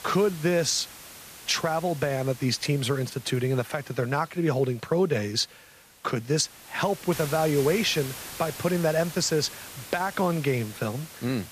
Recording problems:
hiss; noticeable; throughout; 15 dB below the speech

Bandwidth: 14.5 kHz